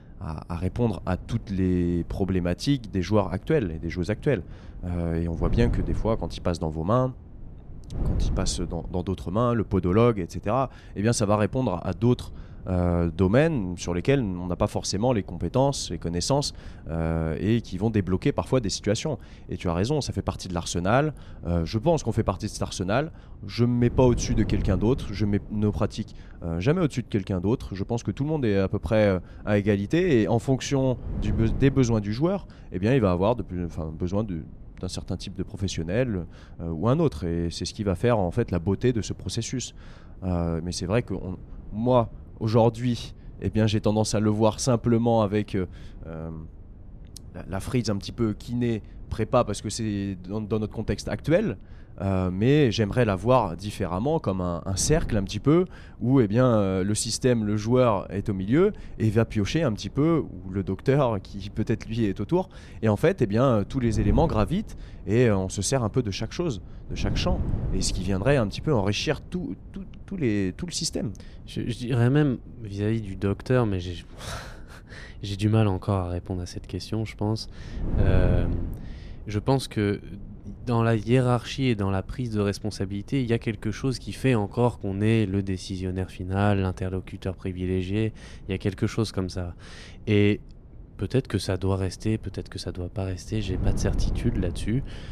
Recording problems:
wind noise on the microphone; occasional gusts; 20 dB below the speech

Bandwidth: 14.5 kHz